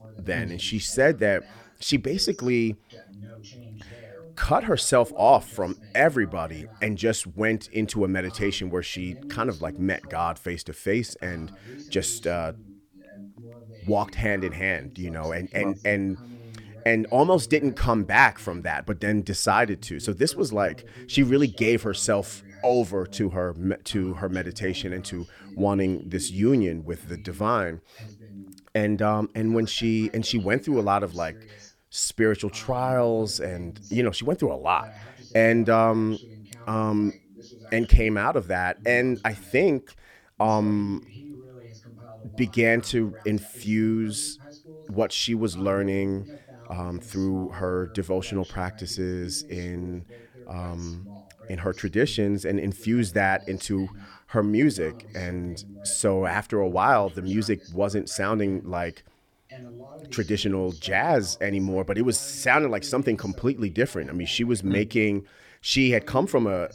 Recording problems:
voice in the background; faint; throughout; 20 dB below the speech

